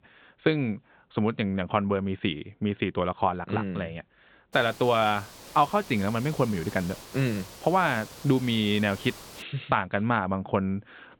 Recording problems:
high frequencies cut off; severe; nothing above 4 kHz
hiss; noticeable; from 4.5 to 9.5 s; 15 dB below the speech

